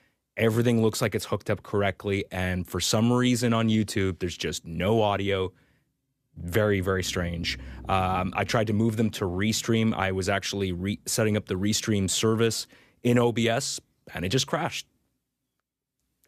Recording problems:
none

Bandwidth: 14.5 kHz